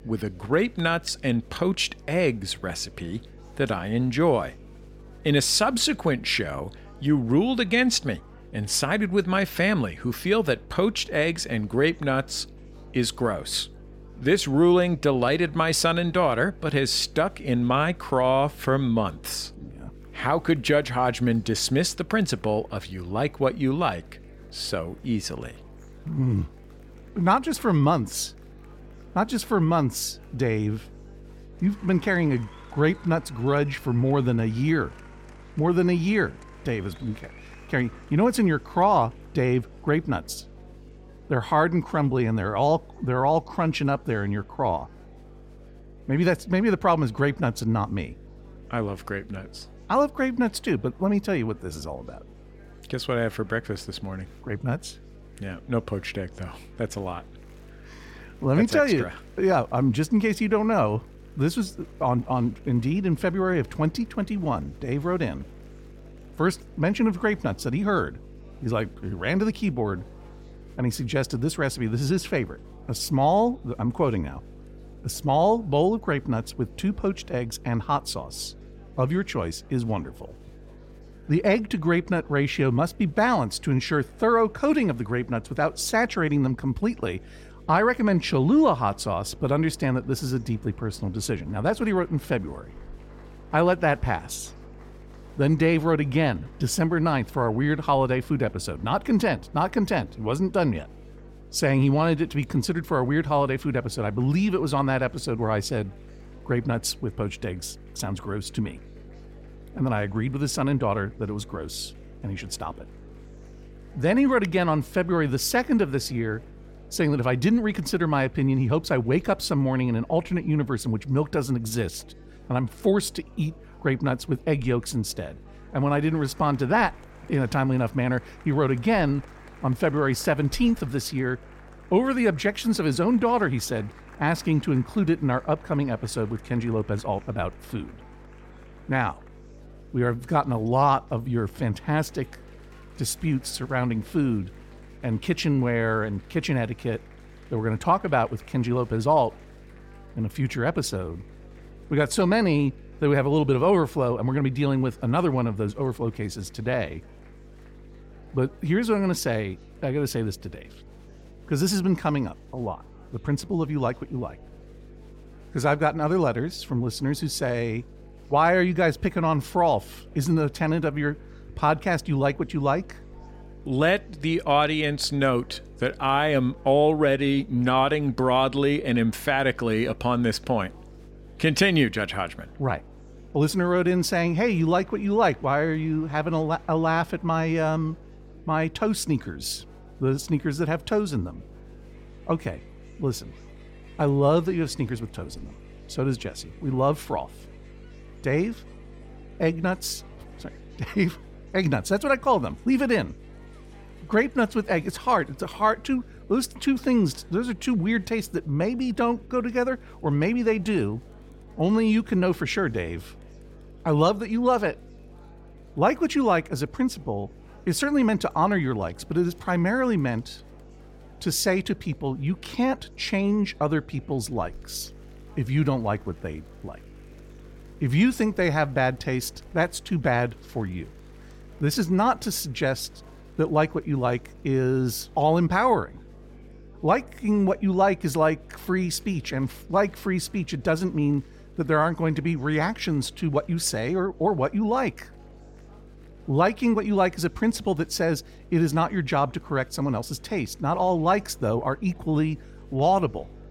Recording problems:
electrical hum; faint; throughout; 50 Hz, 30 dB below the speech
murmuring crowd; faint; throughout; 30 dB below the speech

